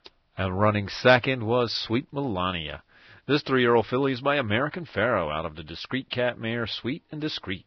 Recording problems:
garbled, watery; badly; nothing above 5.5 kHz

